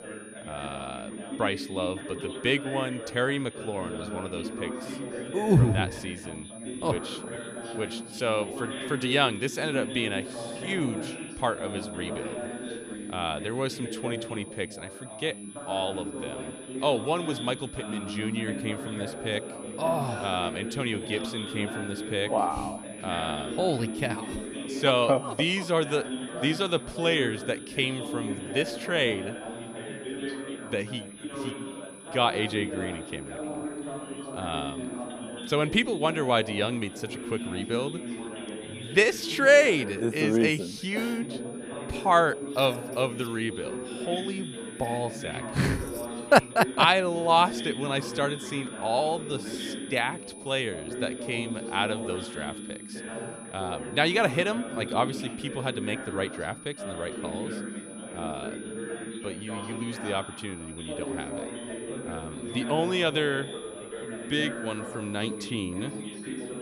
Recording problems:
background chatter; loud; throughout; 3 voices, 9 dB below the speech
high-pitched whine; noticeable; throughout; 10 kHz, 20 dB below the speech

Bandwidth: 15 kHz